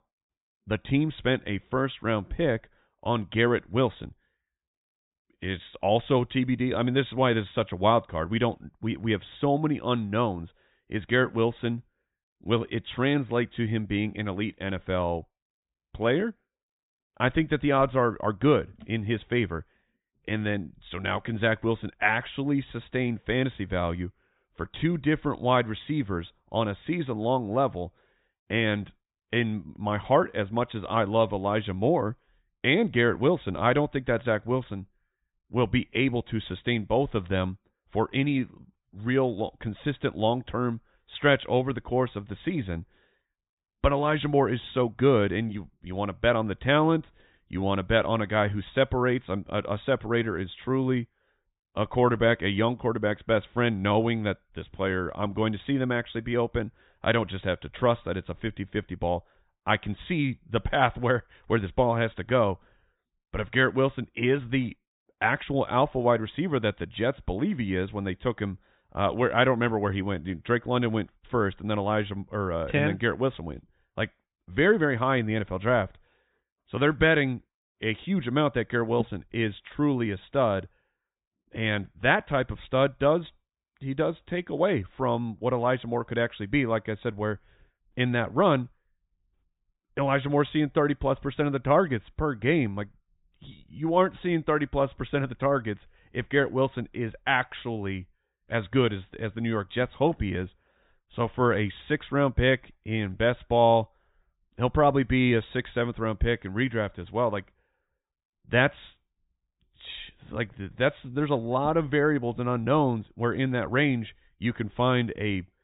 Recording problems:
high frequencies cut off; severe; nothing above 4 kHz

